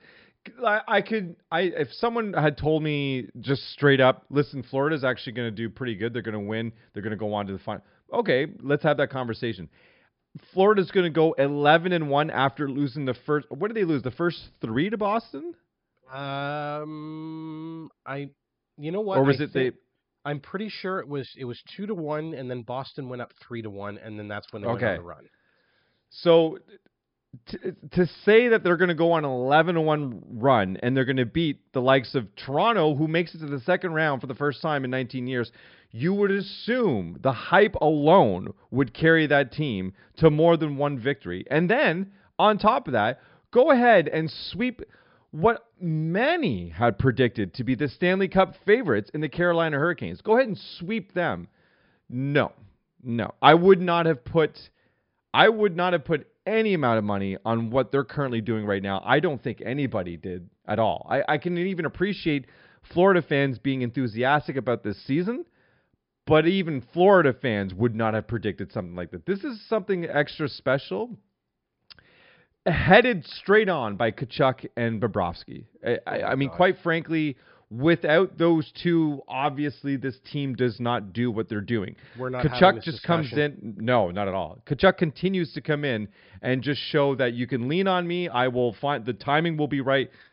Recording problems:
high frequencies cut off; noticeable; nothing above 5.5 kHz

